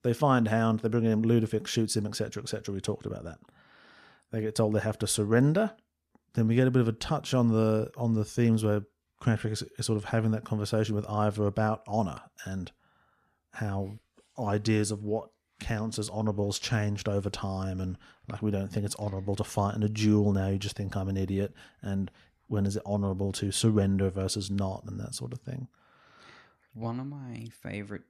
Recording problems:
none

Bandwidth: 14 kHz